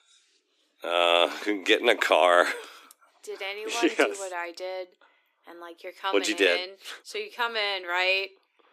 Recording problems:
thin; somewhat; fading below 300 Hz

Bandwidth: 14.5 kHz